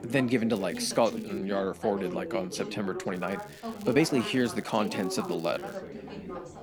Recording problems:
background chatter; loud; throughout; 3 voices, 9 dB below the speech
crackling; faint; at 0.5 s and from 3 to 6 s; 25 dB below the speech
uneven, jittery; strongly; from 1 to 5.5 s

